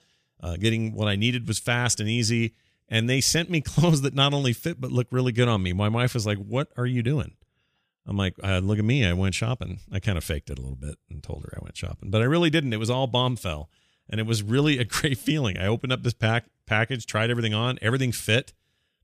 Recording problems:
none

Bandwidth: 15 kHz